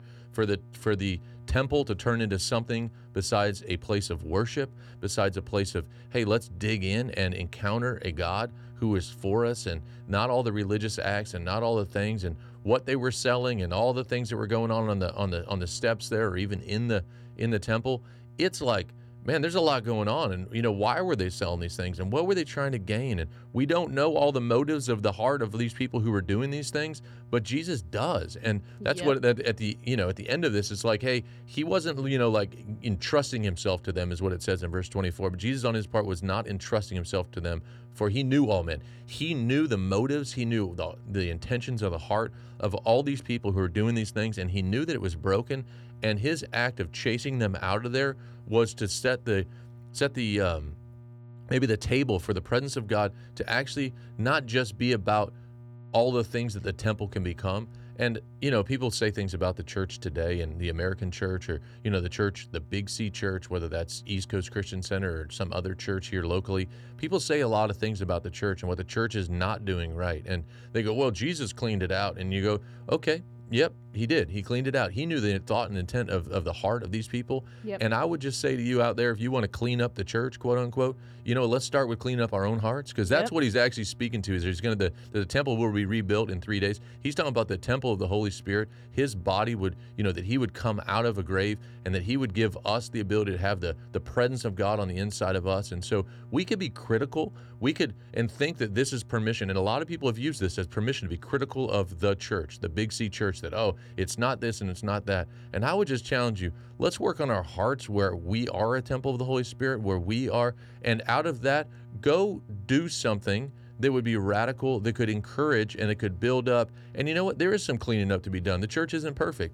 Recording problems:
electrical hum; faint; throughout; 60 Hz, 30 dB below the speech

